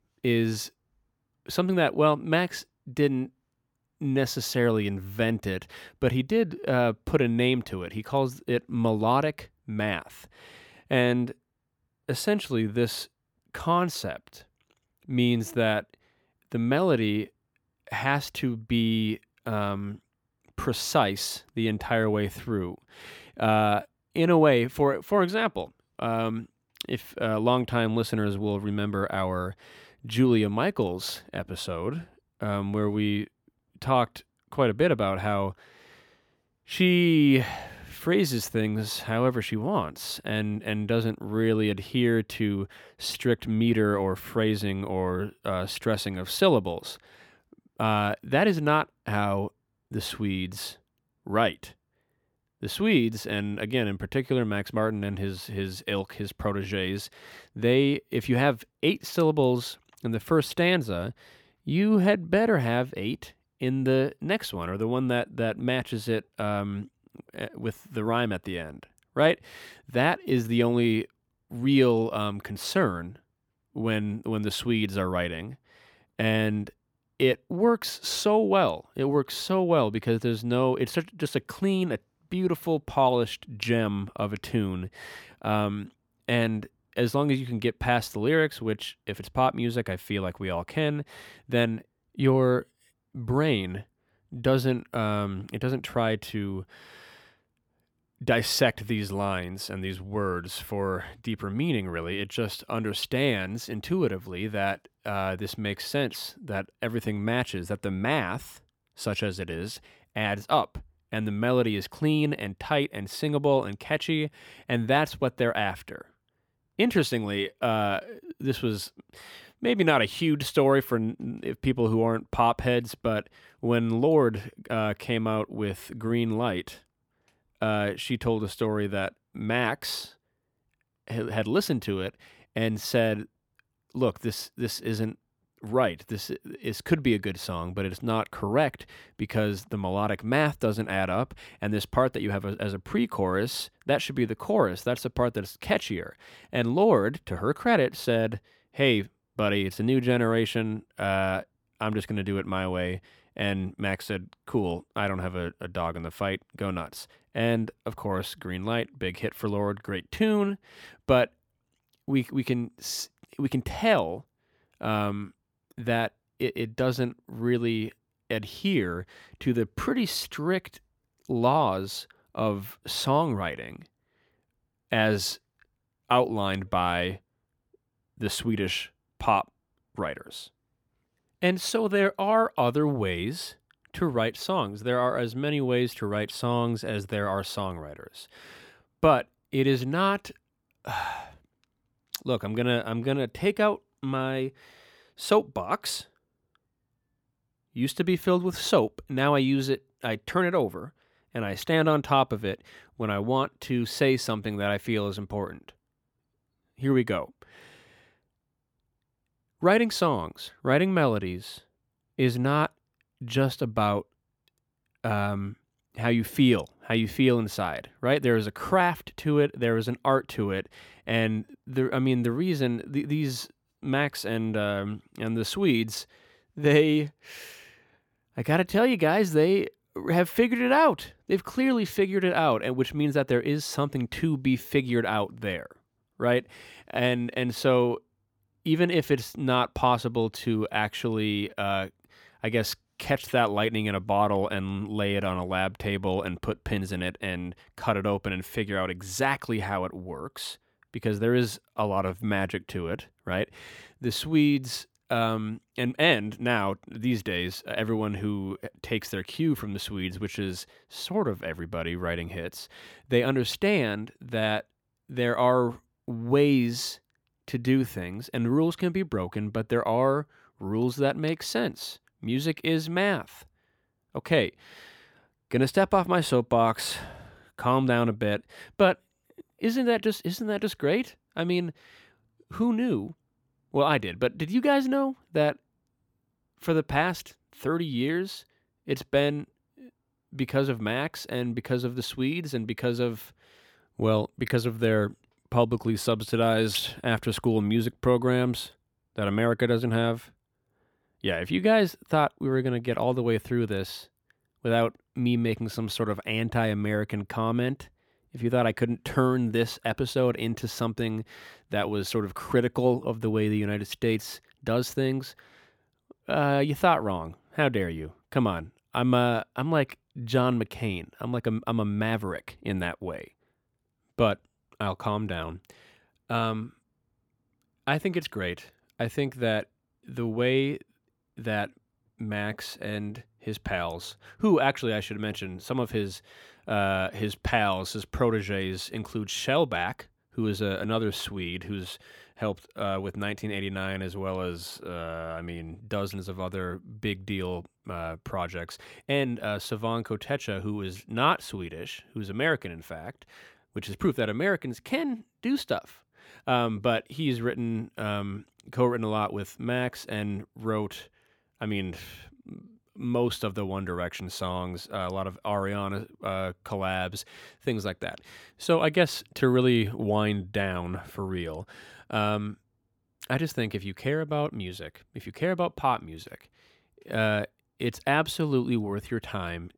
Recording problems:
none

